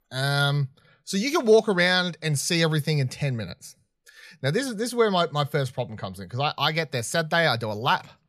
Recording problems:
none

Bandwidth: 14.5 kHz